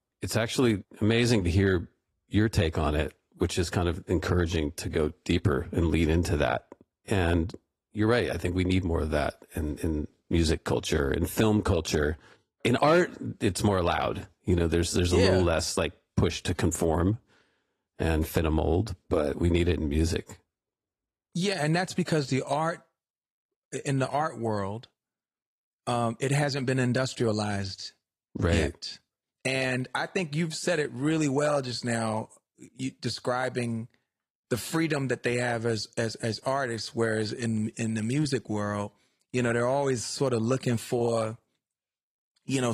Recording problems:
garbled, watery; slightly; nothing above 14 kHz
abrupt cut into speech; at the end

